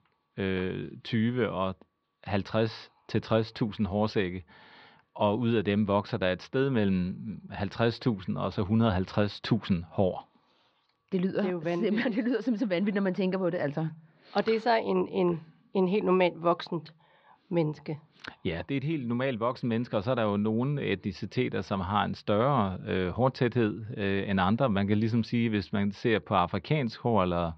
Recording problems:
muffled; slightly; fading above 4.5 kHz

